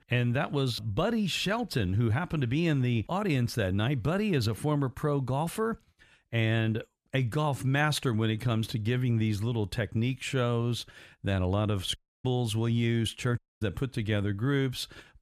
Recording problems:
audio cutting out; at 12 s and at 13 s

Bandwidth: 14.5 kHz